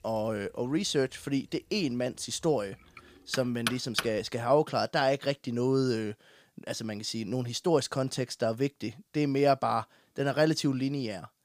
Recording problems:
household noises; loud; until 4.5 s; 6 dB below the speech

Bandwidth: 15 kHz